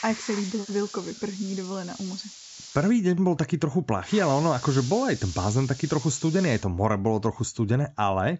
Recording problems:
high frequencies cut off; noticeable; nothing above 7.5 kHz
hiss; noticeable; until 3 s and from 4 to 6.5 s; 15 dB below the speech

